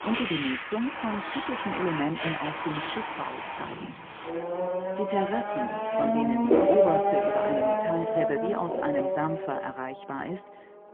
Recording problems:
phone-call audio; poor line; nothing above 3.5 kHz
traffic noise; very loud; throughout; 4 dB above the speech

